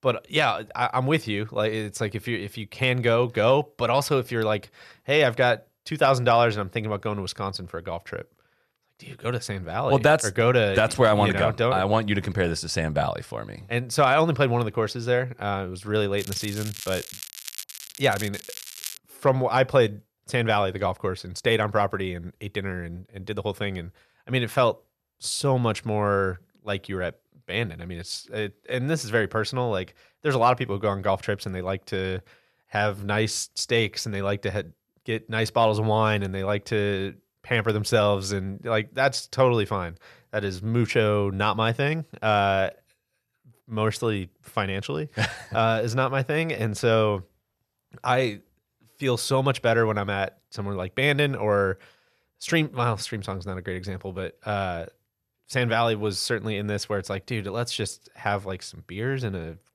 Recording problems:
crackling; noticeable; from 16 to 19 s; 10 dB below the speech

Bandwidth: 13.5 kHz